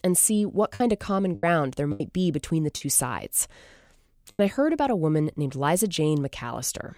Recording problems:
choppy; very; from 1 to 3 s and at 4.5 s; 7% of the speech affected

